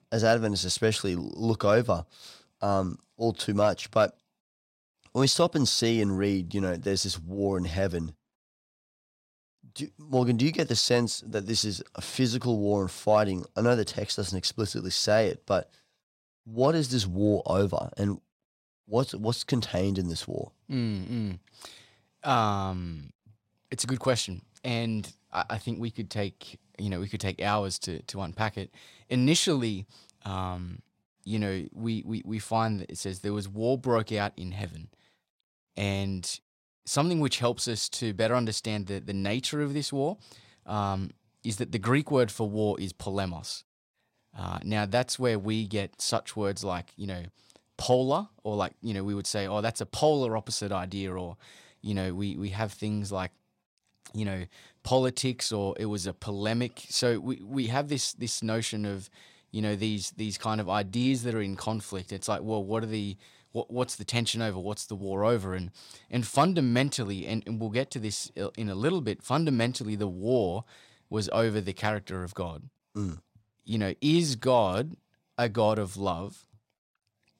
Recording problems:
none

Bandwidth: 16 kHz